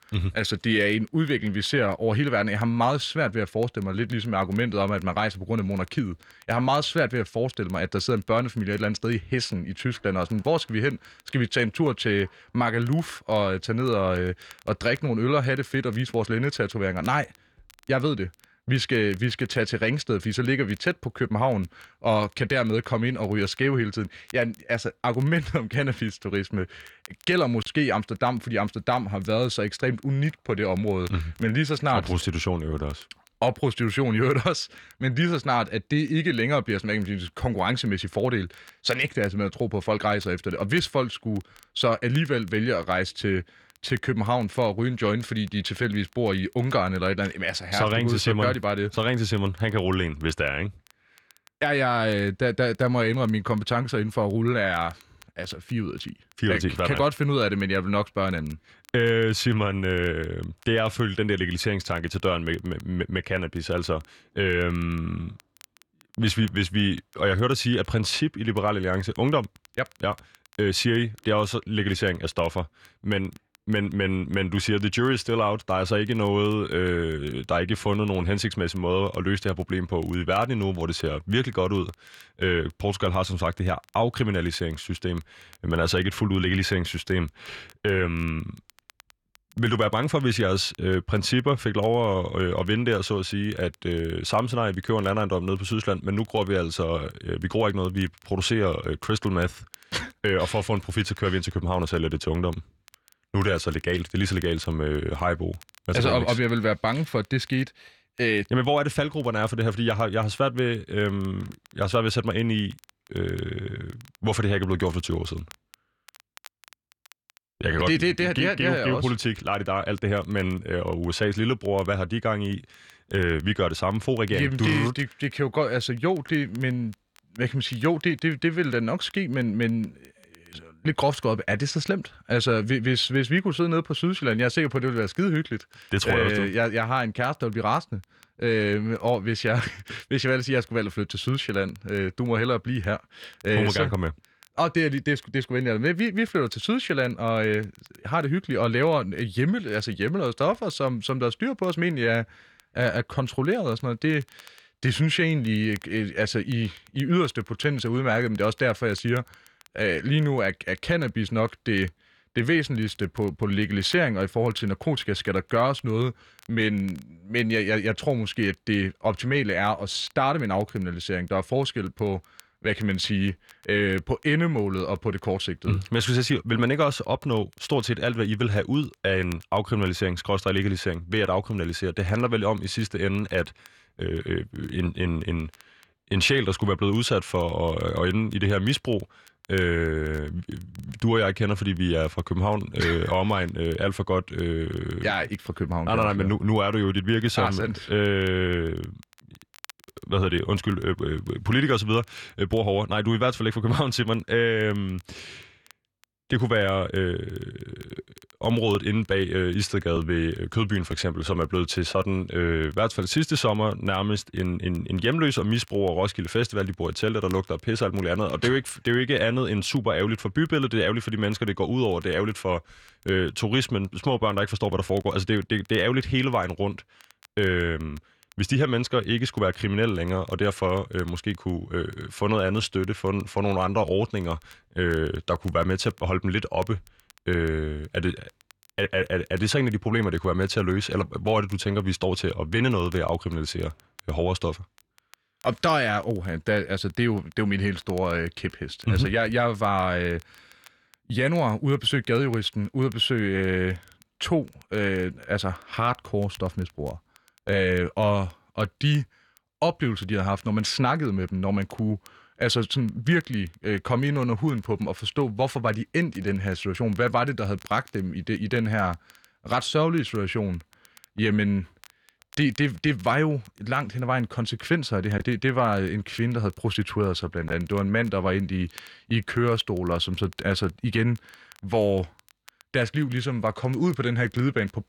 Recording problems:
crackle, like an old record; faint; 30 dB below the speech

